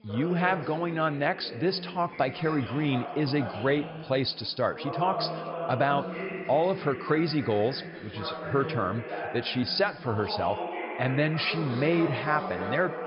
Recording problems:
high frequencies cut off; noticeable; nothing above 5.5 kHz
background chatter; loud; throughout; 4 voices, 8 dB below the speech

